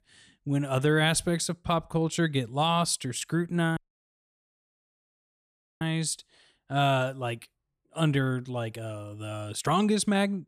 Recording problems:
audio cutting out; at 4 s for 2 s

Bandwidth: 14.5 kHz